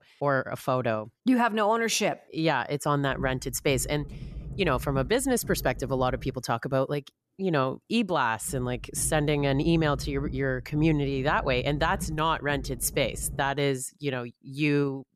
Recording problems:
low rumble; faint; from 3 to 6.5 s and from 8.5 to 13 s; 25 dB below the speech

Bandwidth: 13.5 kHz